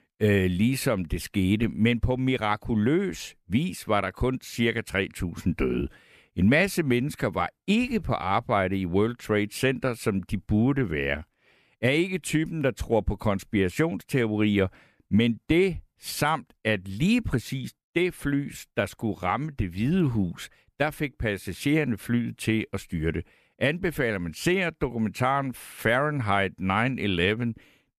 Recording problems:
none

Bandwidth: 14.5 kHz